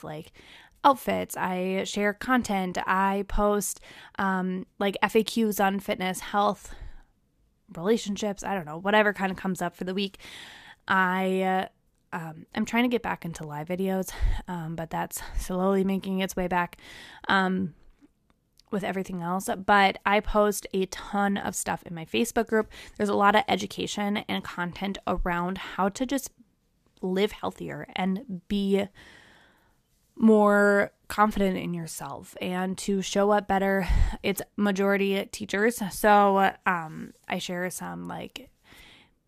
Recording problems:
none

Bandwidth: 14.5 kHz